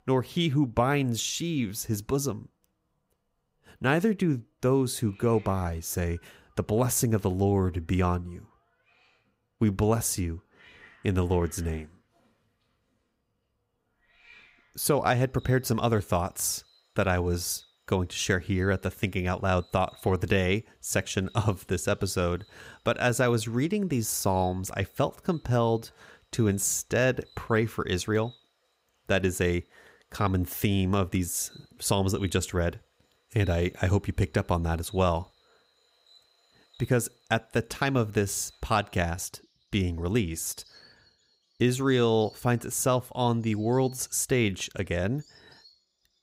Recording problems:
animal sounds; faint; throughout; 30 dB below the speech

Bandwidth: 15.5 kHz